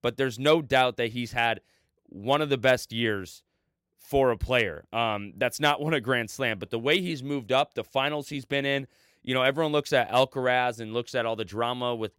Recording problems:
none

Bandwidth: 16 kHz